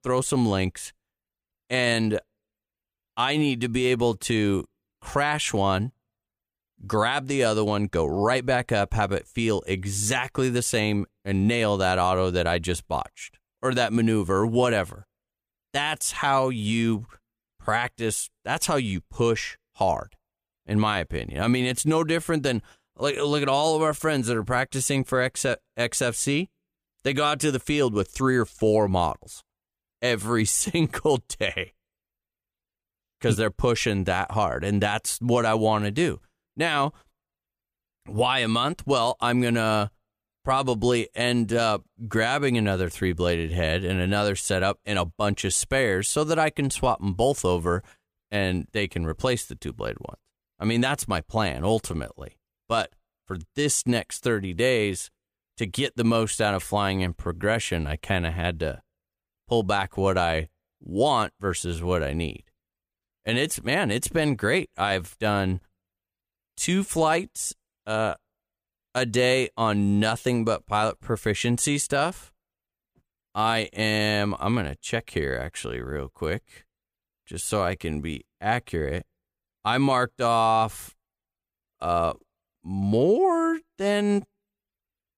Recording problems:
none

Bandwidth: 15 kHz